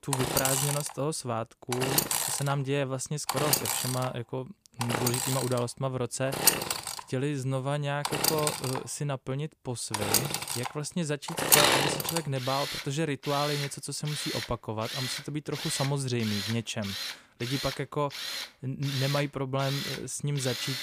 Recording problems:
machinery noise; very loud; throughout; 3 dB above the speech

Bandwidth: 15 kHz